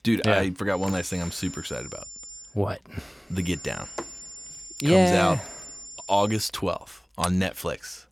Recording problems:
high-pitched whine; noticeable; from 1 to 2.5 s and from 3.5 to 6.5 s; 7 kHz, 15 dB below the speech

